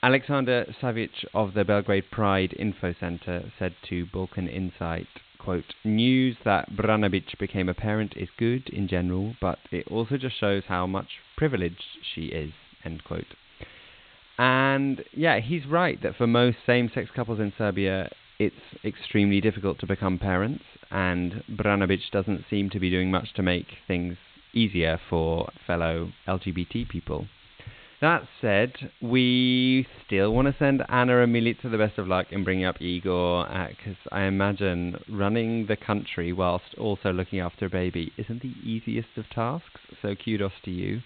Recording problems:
high frequencies cut off; severe; nothing above 4 kHz
hiss; faint; throughout; 25 dB below the speech

